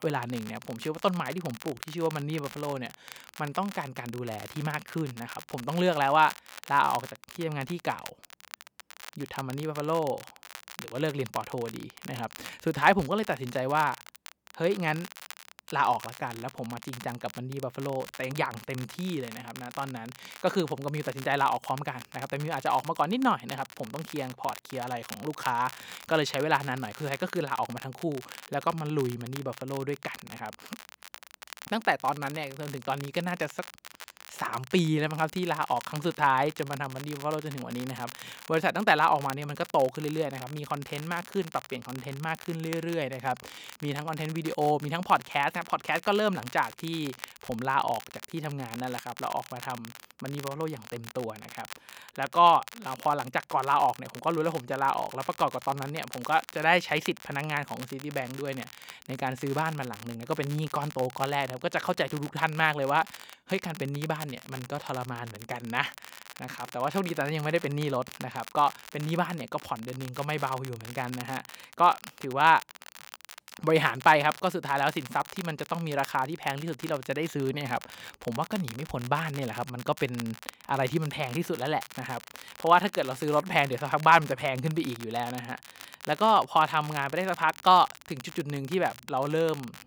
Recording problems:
crackle, like an old record; noticeable; 15 dB below the speech

